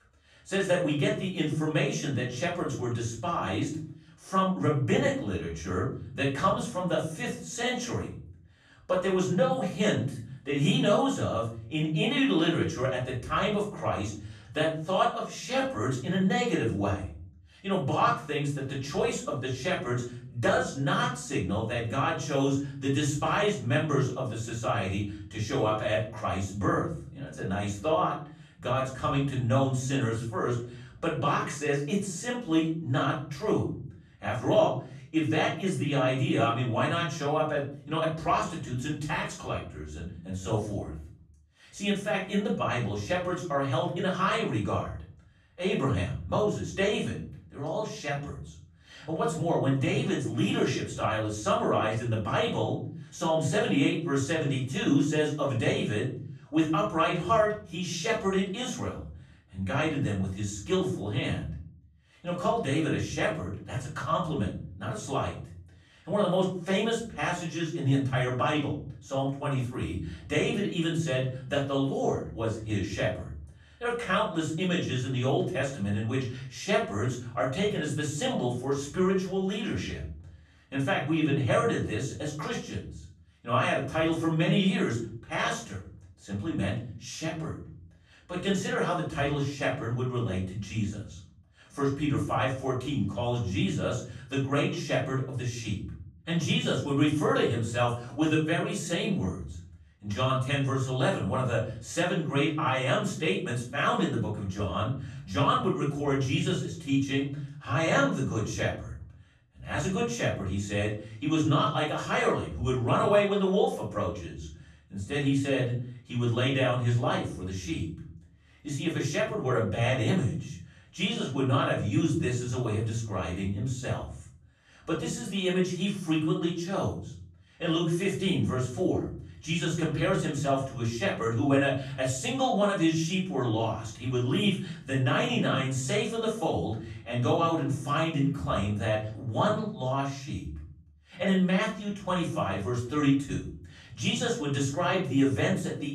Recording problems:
off-mic speech; far
room echo; noticeable; dies away in 0.6 s

